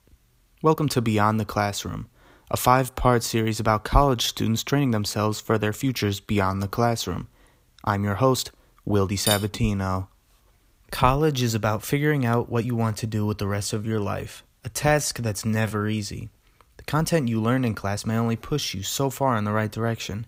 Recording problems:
uneven, jittery; strongly; from 0.5 to 19 s
clattering dishes; noticeable; at 9.5 s; peak 2 dB below the speech

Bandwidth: 15.5 kHz